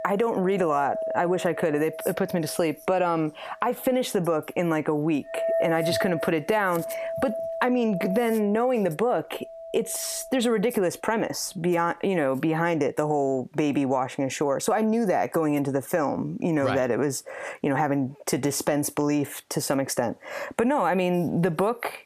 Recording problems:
squashed, flat; somewhat
household noises; loud; until 12 s; 8 dB below the speech

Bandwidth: 14.5 kHz